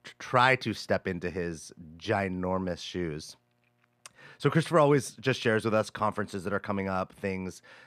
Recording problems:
muffled; slightly; fading above 4 kHz

